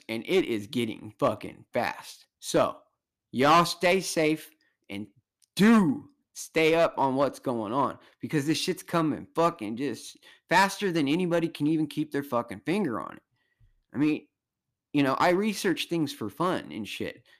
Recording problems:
distortion; slight; 3% of the sound clipped

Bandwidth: 14.5 kHz